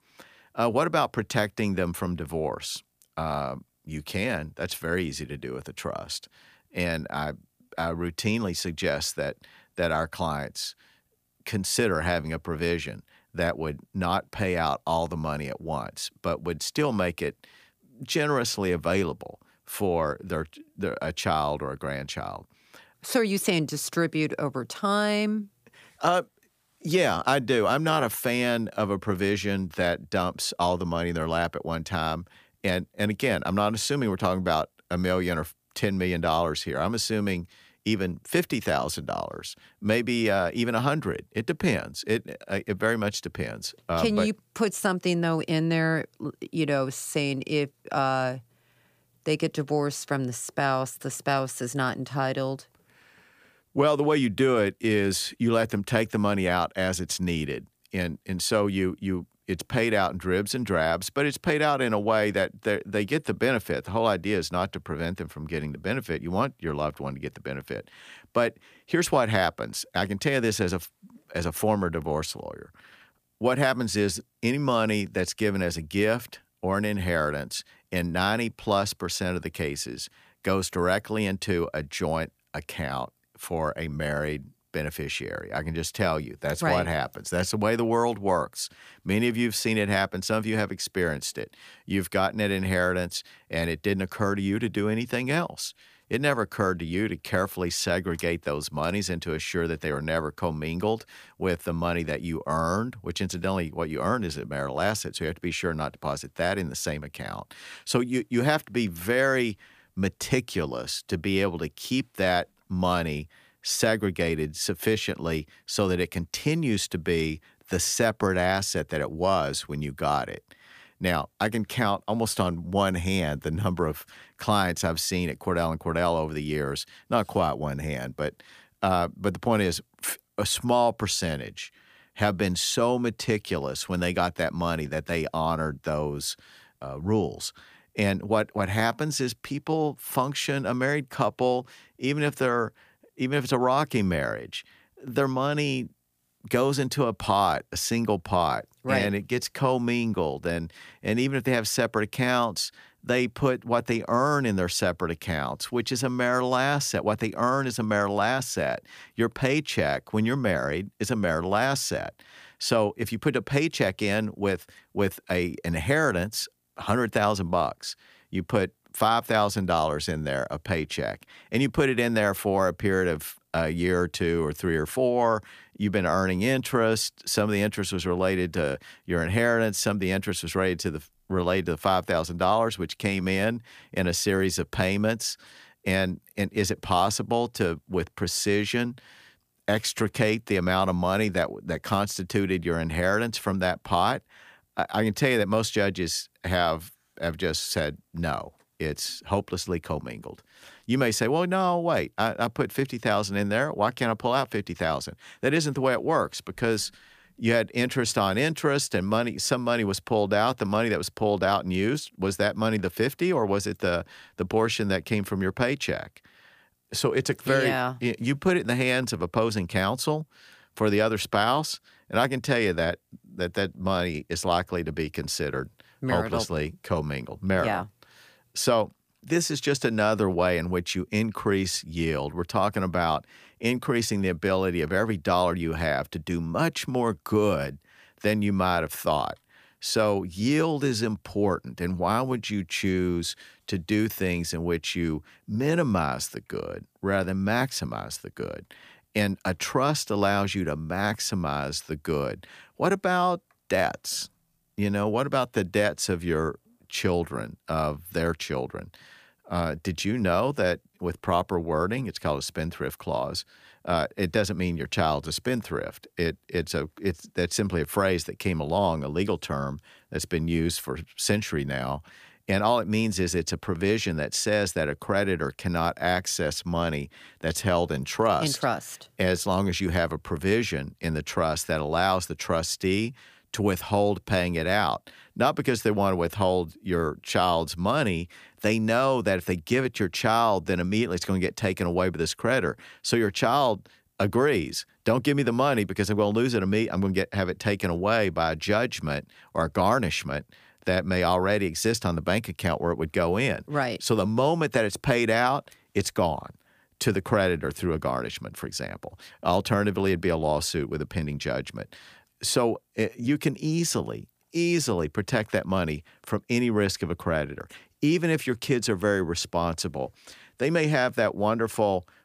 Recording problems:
none

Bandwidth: 15 kHz